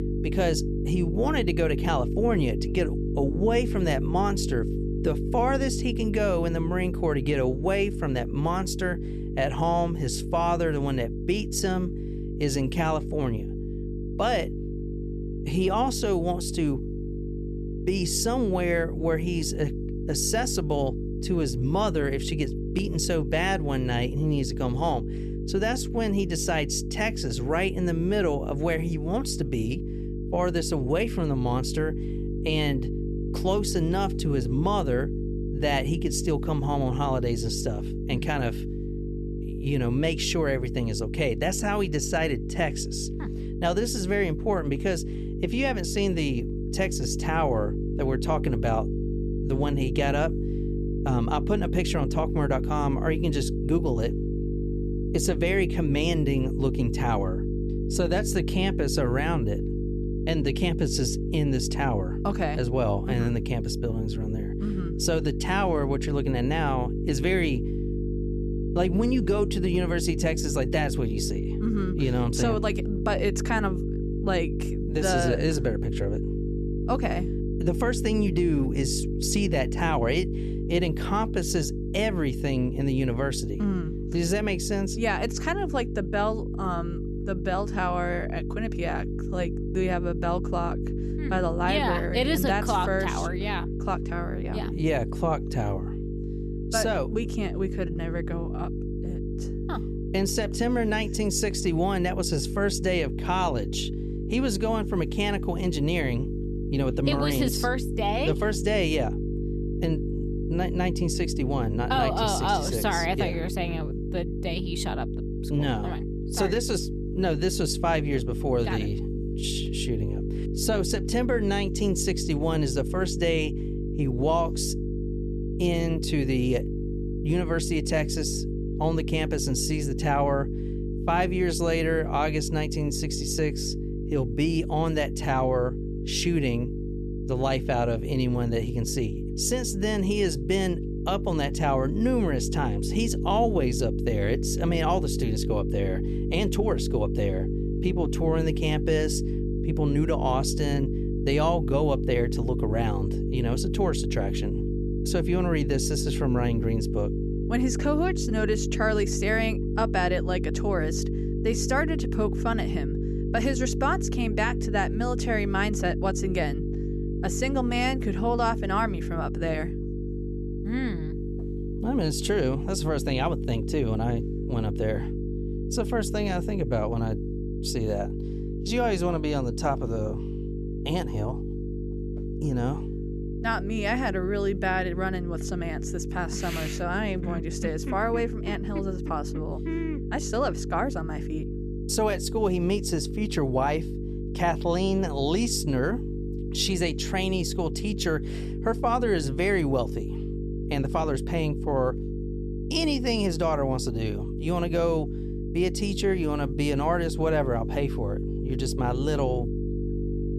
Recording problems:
electrical hum; loud; throughout; 50 Hz, 9 dB below the speech

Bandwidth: 13.5 kHz